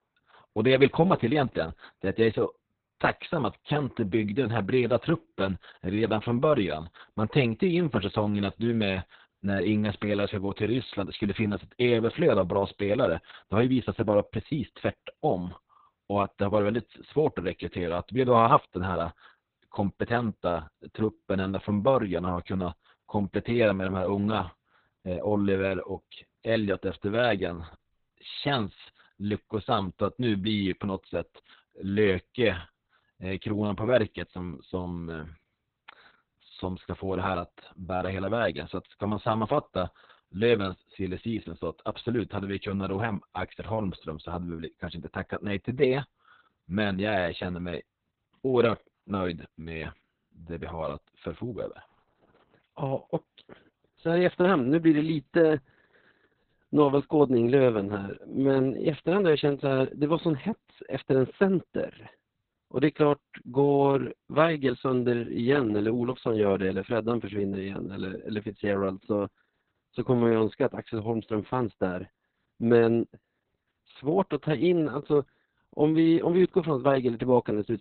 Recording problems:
garbled, watery; badly; nothing above 4 kHz

